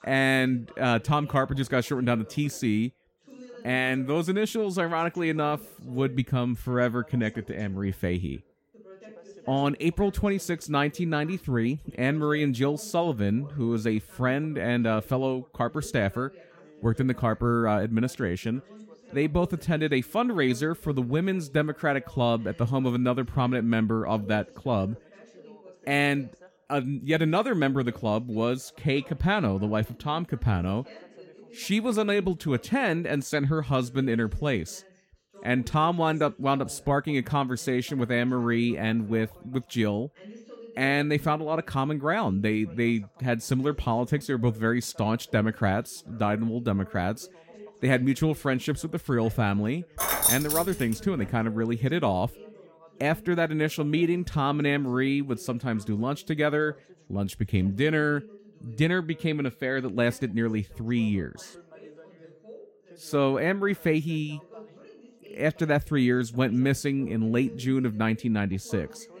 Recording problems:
background chatter; faint; throughout; 2 voices, 25 dB below the speech
jangling keys; loud; at 50 s; peak 5 dB above the speech

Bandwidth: 16.5 kHz